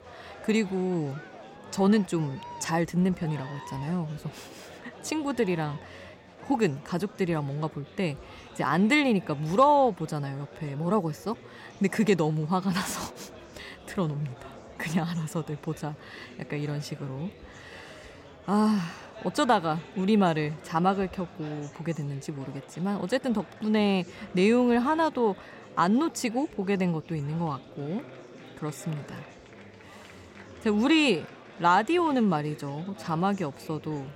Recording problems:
murmuring crowd; noticeable; throughout; 20 dB below the speech

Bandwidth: 16 kHz